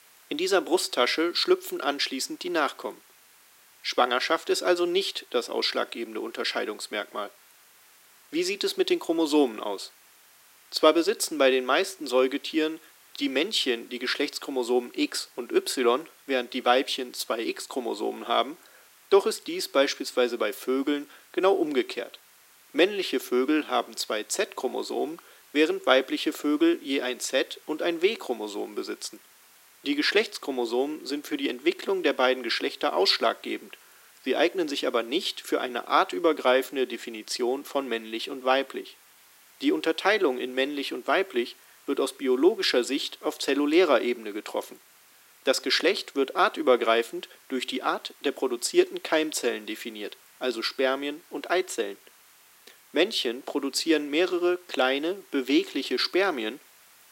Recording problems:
thin; somewhat; fading below 300 Hz
hiss; faint; throughout; 25 dB below the speech

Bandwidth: 16 kHz